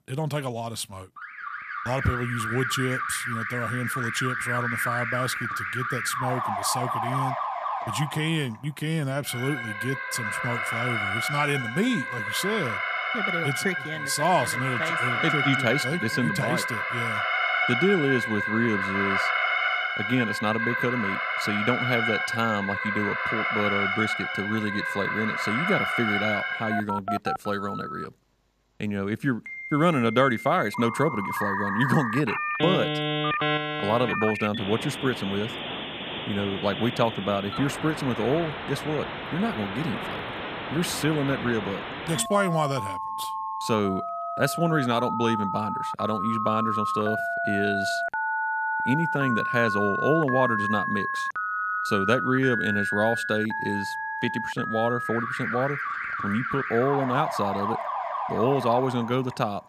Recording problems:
alarms or sirens; loud; throughout; 1 dB below the speech

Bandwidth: 14.5 kHz